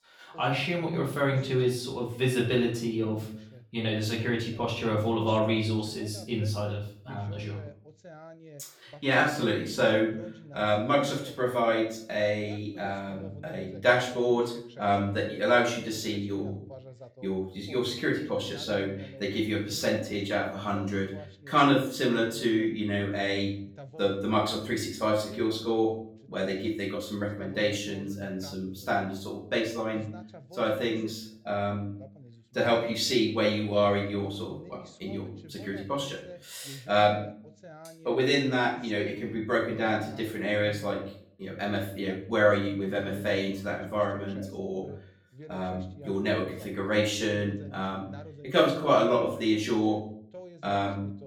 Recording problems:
off-mic speech; far
room echo; slight; dies away in 0.5 s
voice in the background; faint; throughout; 20 dB below the speech

